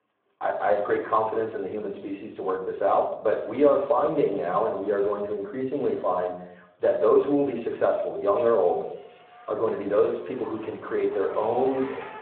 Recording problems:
room echo; slight; dies away in 0.6 s
phone-call audio; nothing above 3.5 kHz
off-mic speech; somewhat distant
traffic noise; noticeable; throughout; 20 dB below the speech

